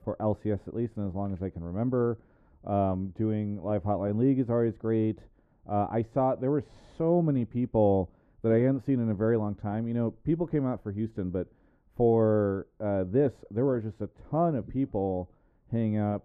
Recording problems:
muffled; very; fading above 1.5 kHz

